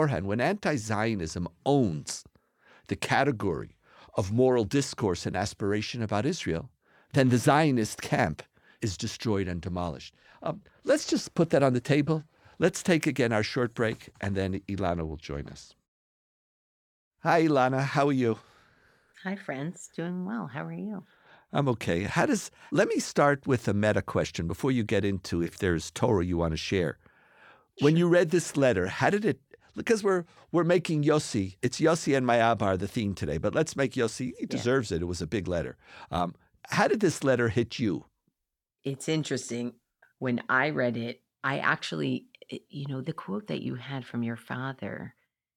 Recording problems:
abrupt cut into speech; at the start

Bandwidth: 18 kHz